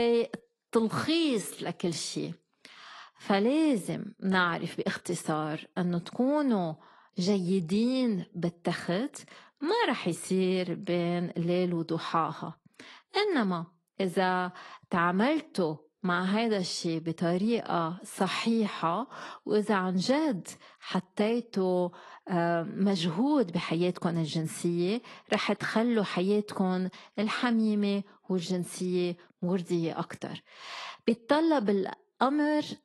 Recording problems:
garbled, watery; slightly; nothing above 11.5 kHz
abrupt cut into speech; at the start

